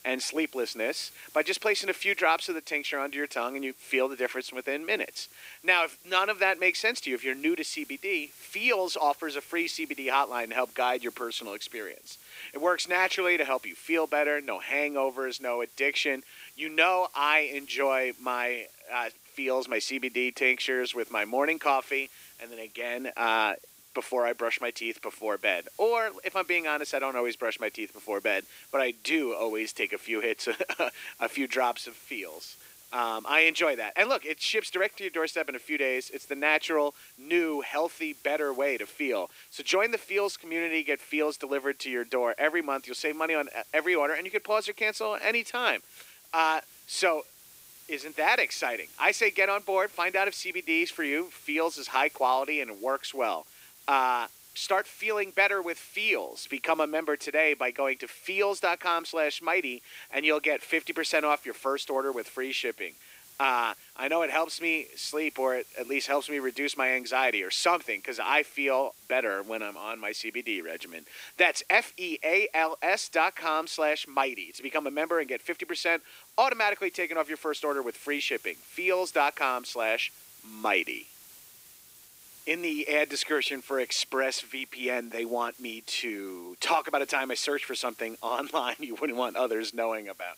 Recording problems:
thin; somewhat; fading below 300 Hz
hiss; faint; throughout; 20 dB below the speech

